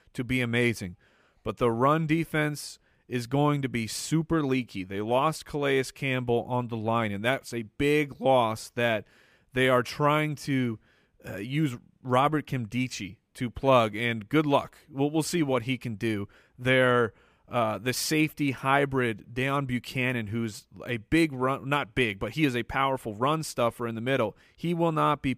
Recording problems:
none

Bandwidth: 15 kHz